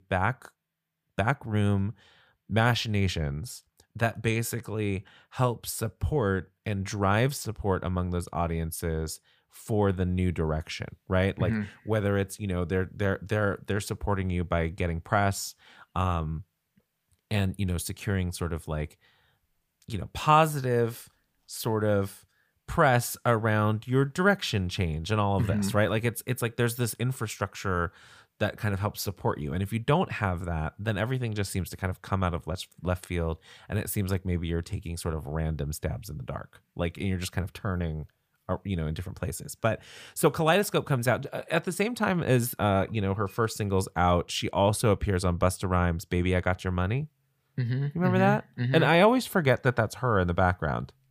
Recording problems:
none

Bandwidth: 15 kHz